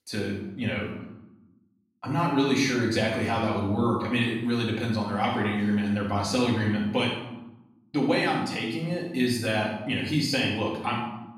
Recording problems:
off-mic speech; far
room echo; noticeable; dies away in 0.8 s

